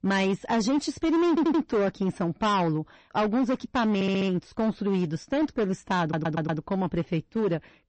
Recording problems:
distortion; slight; 15% of the sound clipped
garbled, watery; slightly; nothing above 8 kHz
audio stuttering; at 1.5 s, at 4 s and at 6 s

